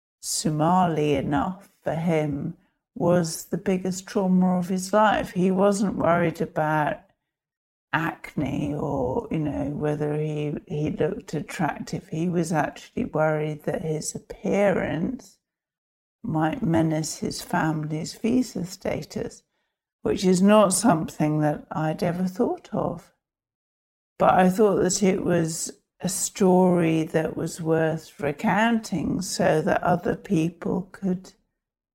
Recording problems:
wrong speed, natural pitch; too slow; 0.6 times normal speed

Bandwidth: 16 kHz